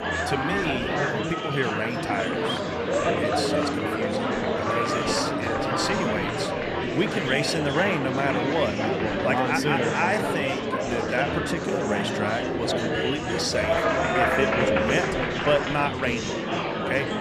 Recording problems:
murmuring crowd; very loud; throughout; 3 dB above the speech

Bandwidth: 14.5 kHz